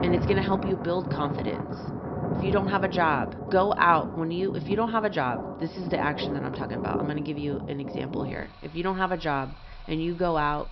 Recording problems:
high frequencies cut off; noticeable; nothing above 5.5 kHz
rain or running water; loud; throughout; 5 dB below the speech

